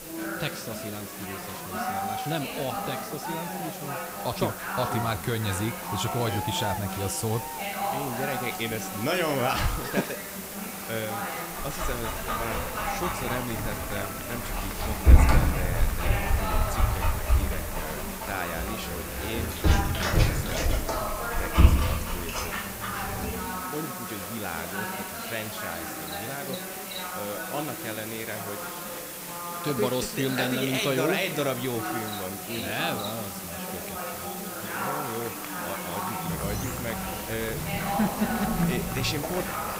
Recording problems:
animal sounds; very loud; throughout; 3 dB above the speech
murmuring crowd; loud; throughout; 2 dB below the speech
hiss; loud; throughout; 5 dB below the speech

